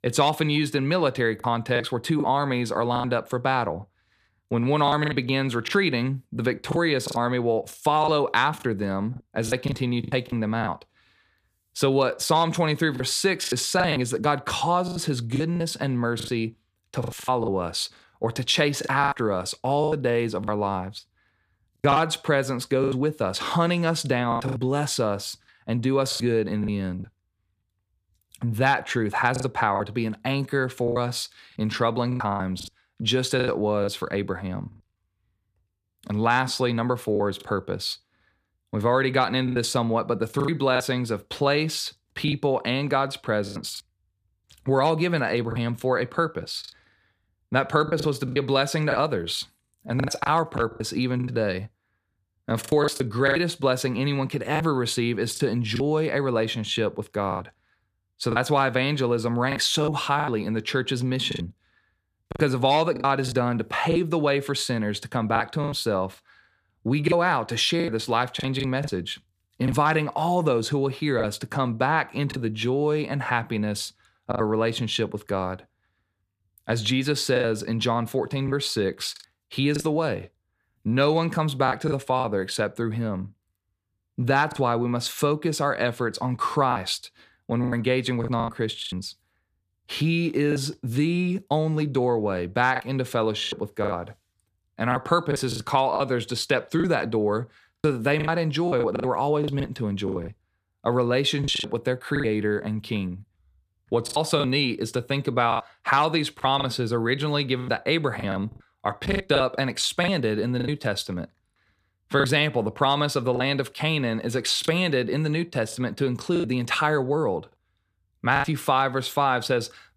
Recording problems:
choppy; very; 8% of the speech affected

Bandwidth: 15 kHz